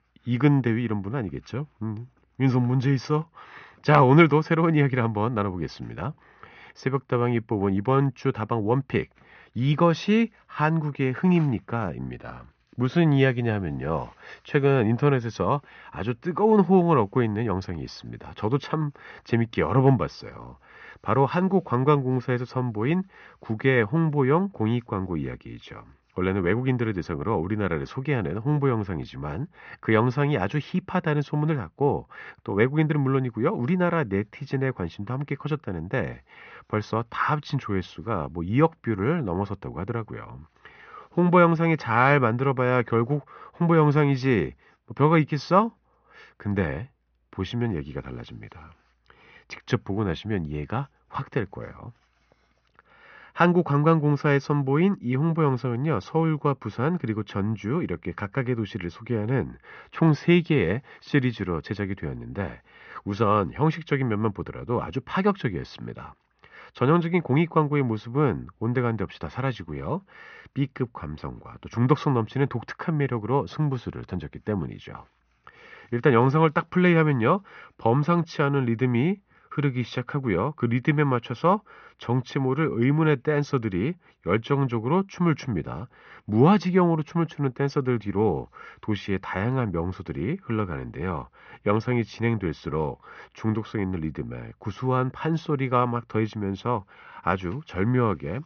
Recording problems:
high frequencies cut off; noticeable; nothing above 6.5 kHz
muffled; very slightly; fading above 2.5 kHz

